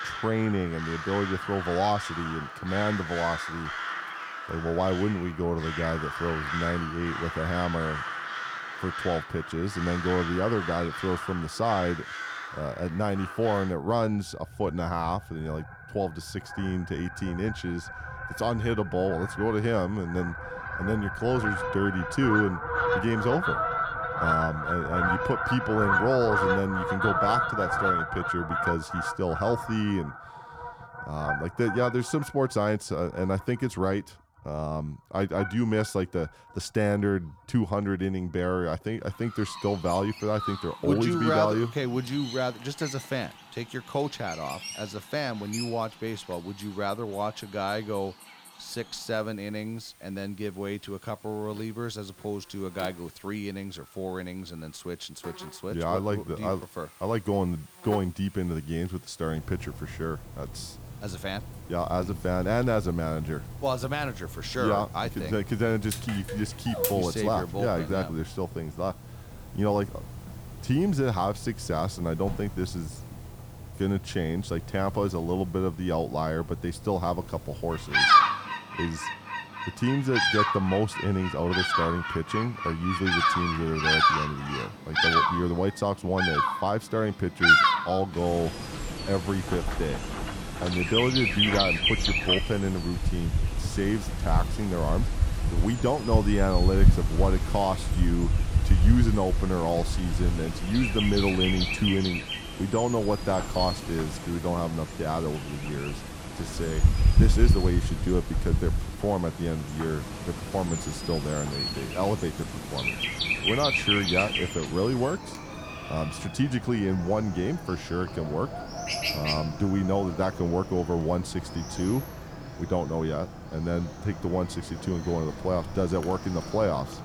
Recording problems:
animal sounds; very loud; throughout; as loud as the speech

